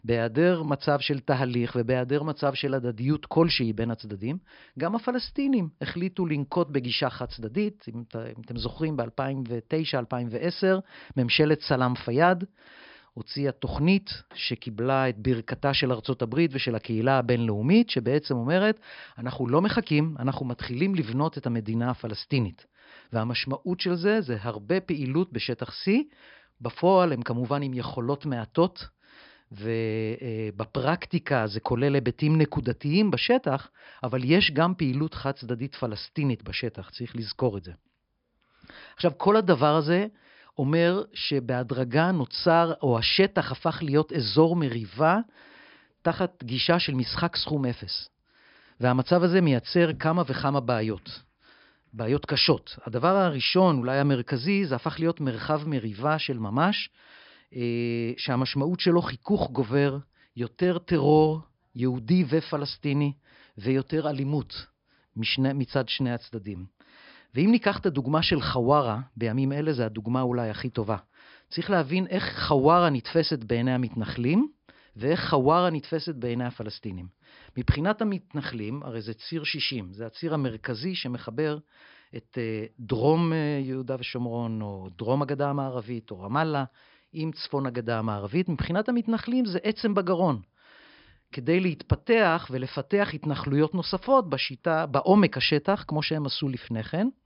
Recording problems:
high frequencies cut off; noticeable; nothing above 5.5 kHz

